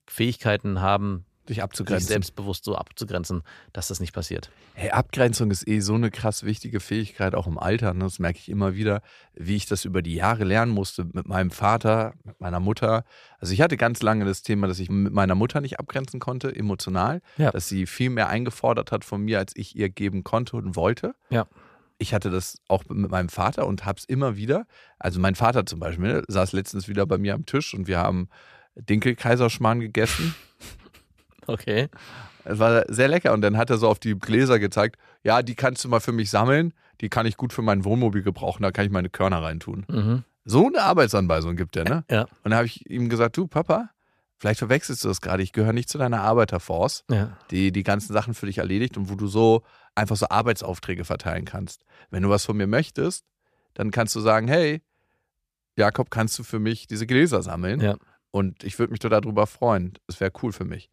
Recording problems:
none

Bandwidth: 14.5 kHz